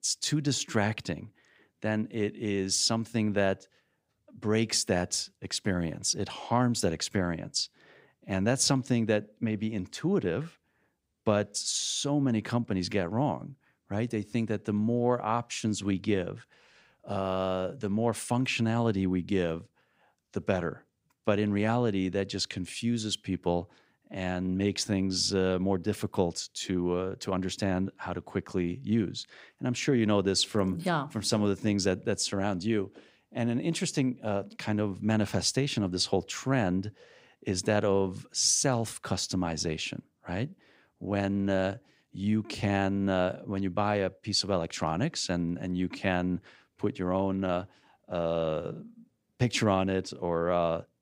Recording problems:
none

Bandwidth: 15.5 kHz